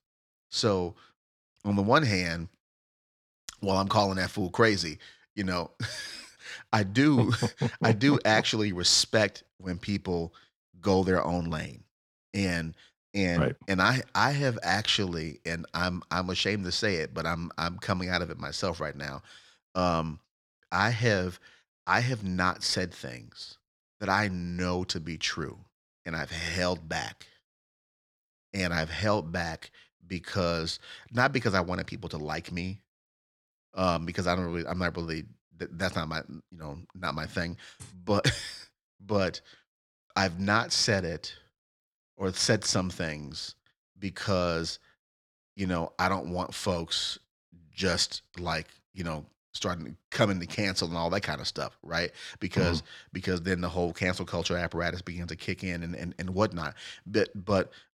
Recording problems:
none

